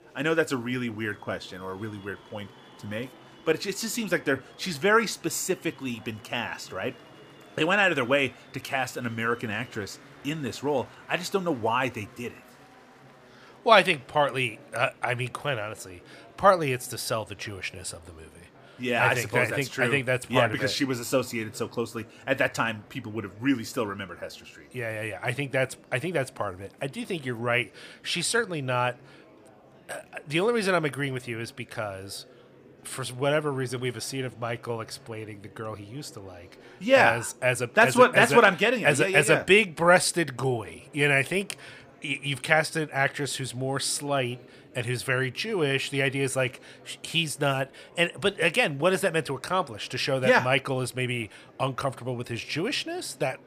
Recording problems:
murmuring crowd; faint; throughout; 25 dB below the speech

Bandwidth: 15 kHz